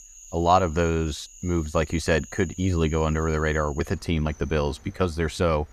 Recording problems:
animal sounds; noticeable; throughout; 20 dB below the speech

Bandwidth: 14.5 kHz